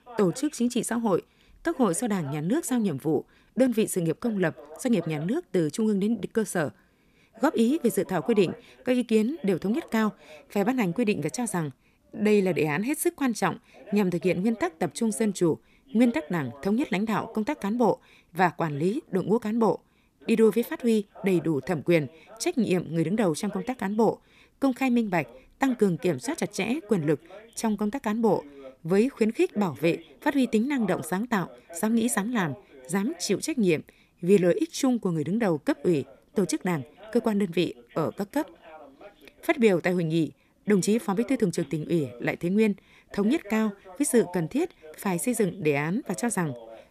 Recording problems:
voice in the background; faint; throughout; 20 dB below the speech

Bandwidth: 14.5 kHz